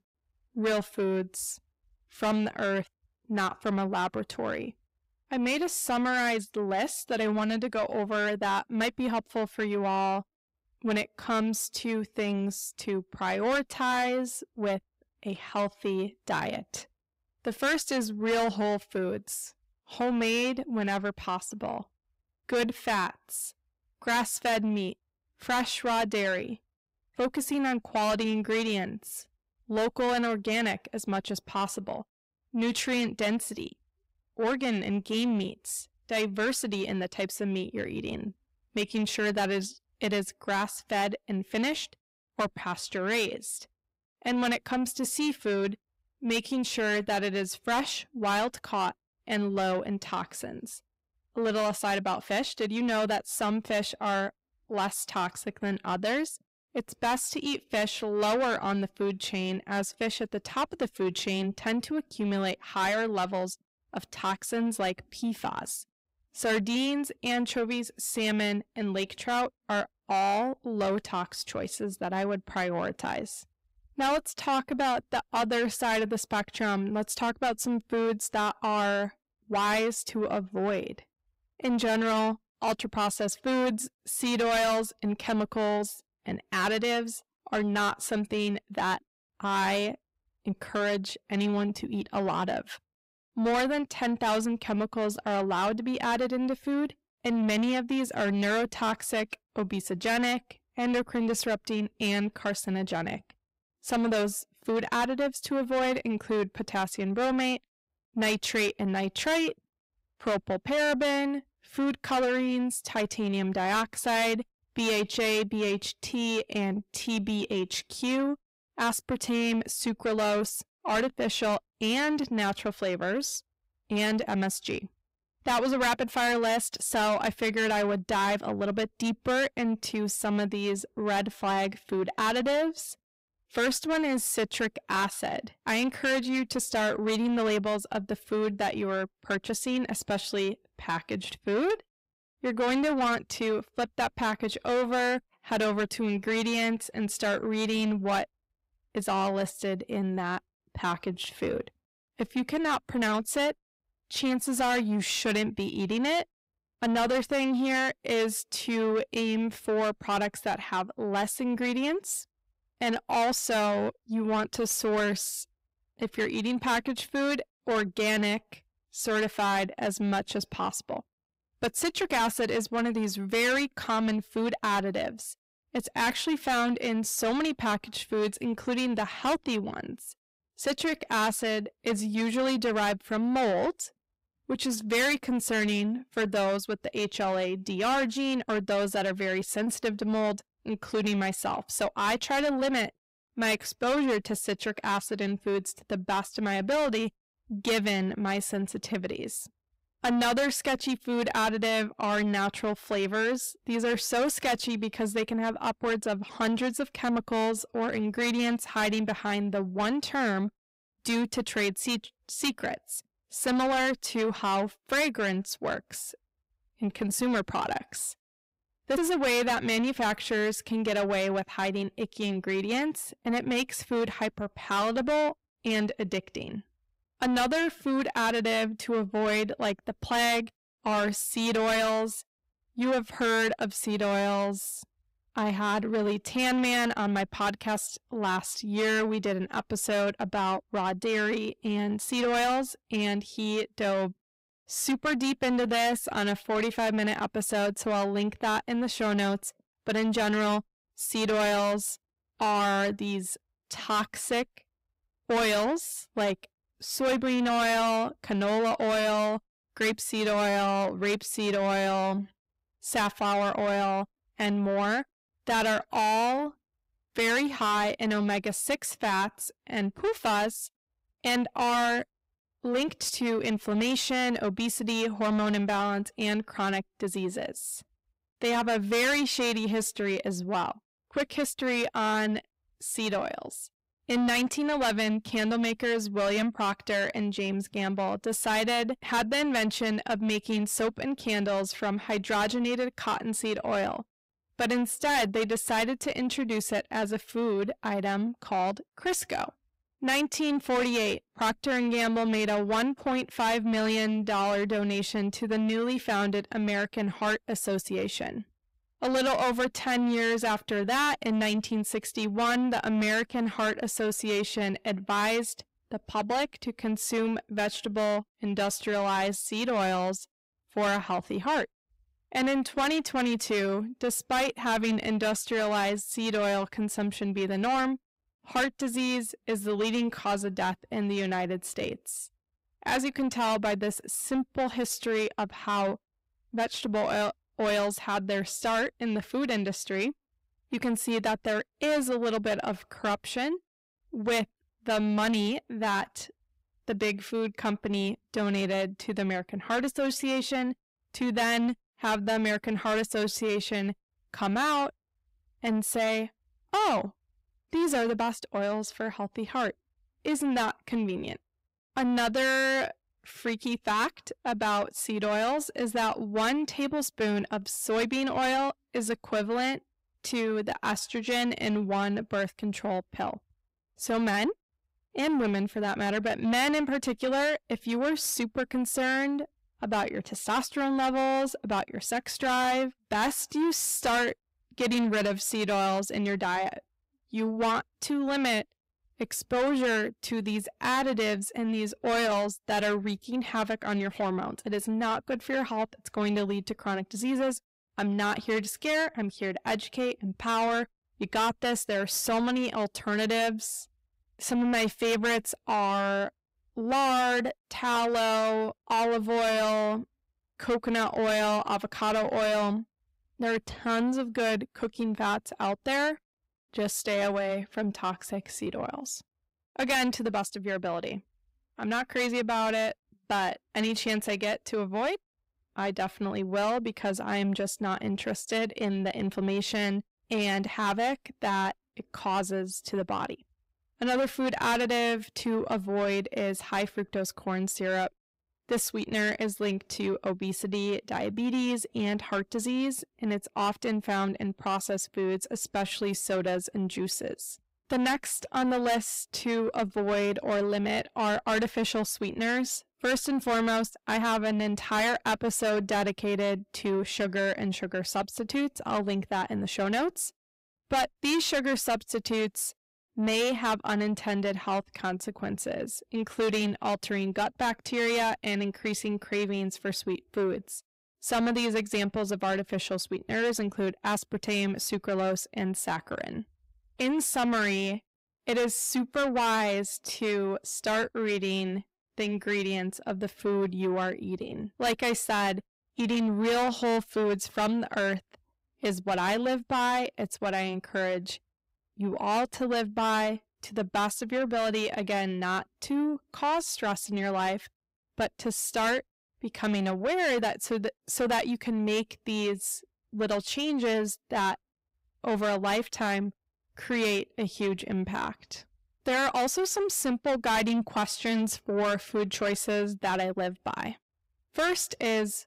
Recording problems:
distortion; heavy; 6 dB below the speech

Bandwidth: 15.5 kHz